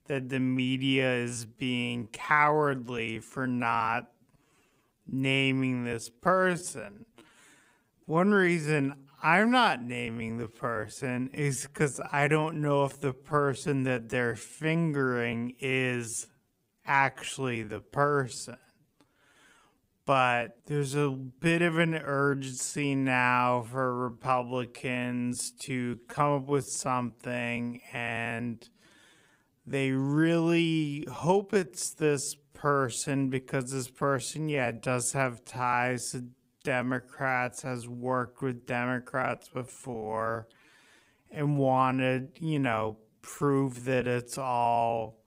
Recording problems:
wrong speed, natural pitch; too slow; 0.5 times normal speed

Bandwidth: 15.5 kHz